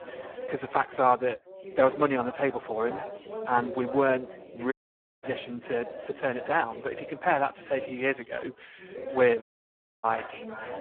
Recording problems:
phone-call audio; poor line
background chatter; noticeable; throughout; 3 voices, 15 dB below the speech
audio cutting out; at 4.5 s for 0.5 s and at 9.5 s for 0.5 s

